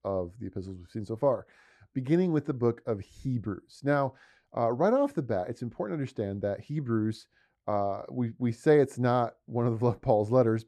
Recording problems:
muffled; slightly; fading above 1.5 kHz

